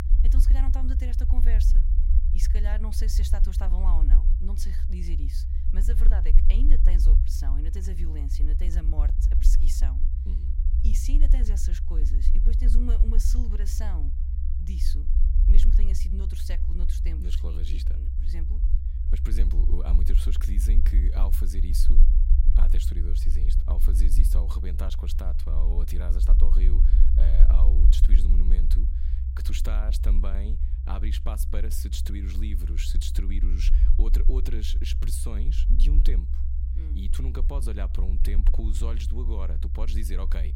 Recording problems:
low rumble; loud; throughout; 4 dB below the speech

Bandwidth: 16 kHz